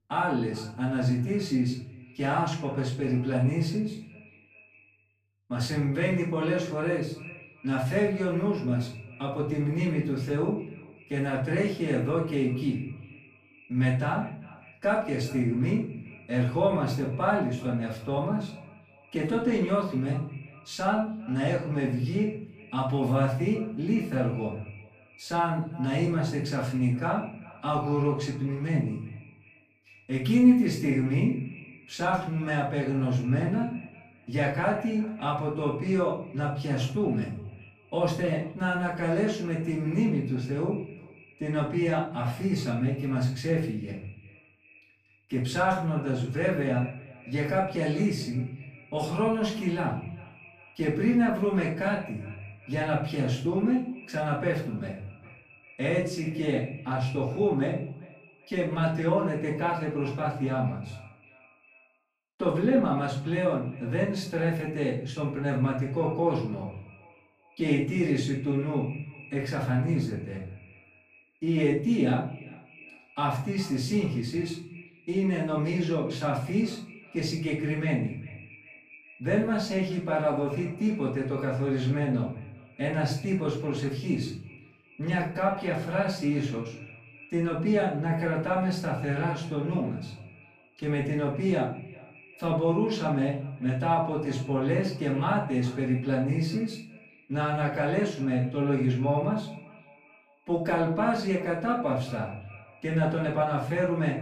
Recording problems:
off-mic speech; far
room echo; noticeable; dies away in 0.5 s
echo of what is said; faint; throughout; 400 ms later, 20 dB below the speech

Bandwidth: 15 kHz